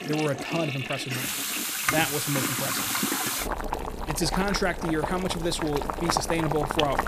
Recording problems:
household noises; very loud; throughout; as loud as the speech

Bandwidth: 14.5 kHz